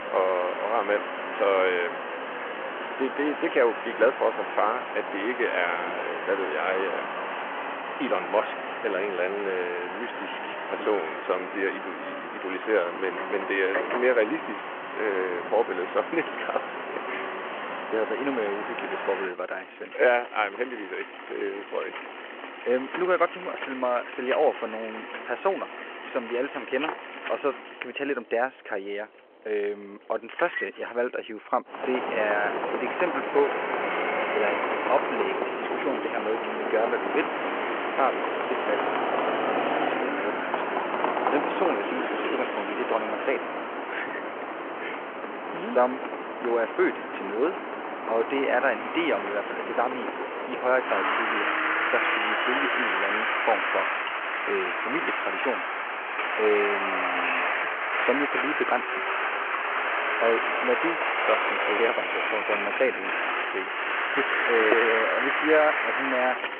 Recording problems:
phone-call audio
traffic noise; loud; throughout; as loud as the speech

